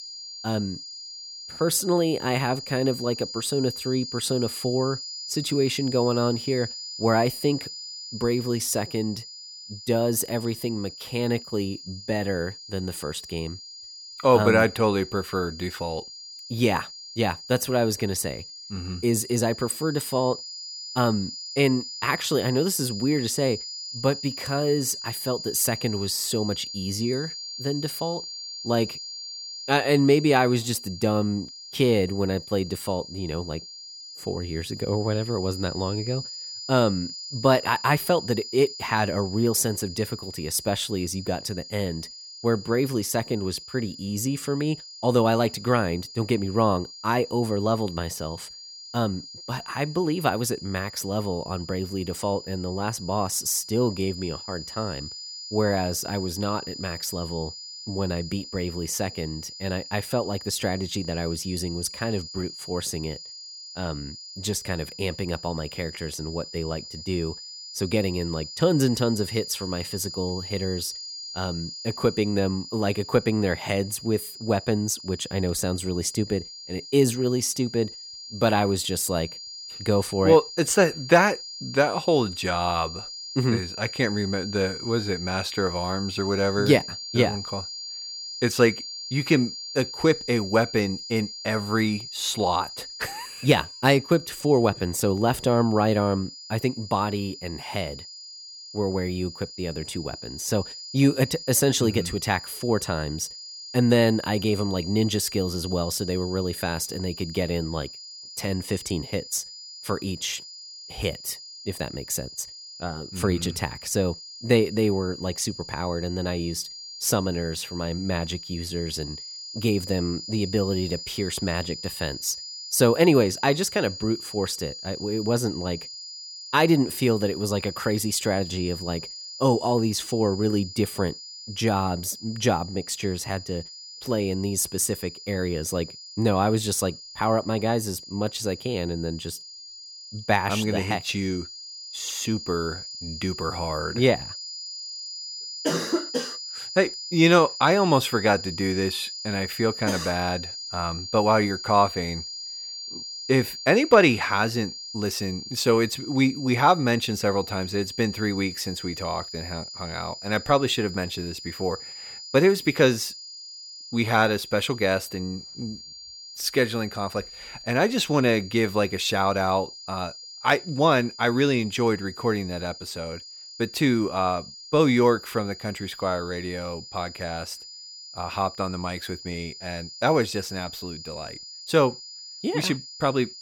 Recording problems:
high-pitched whine; noticeable; throughout; 5 kHz, 10 dB below the speech

